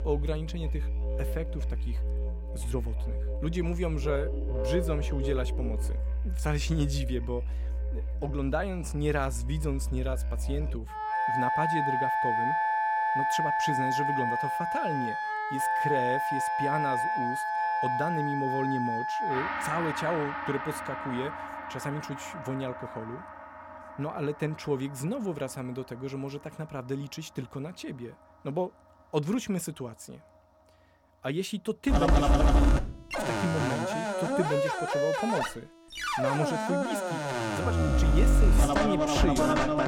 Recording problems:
background music; very loud; throughout; 4 dB above the speech

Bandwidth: 17 kHz